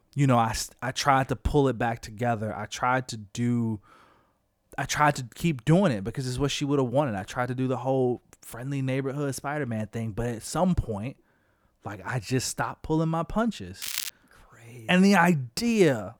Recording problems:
crackling; loud; at 14 s, mostly in the pauses; 6 dB below the speech

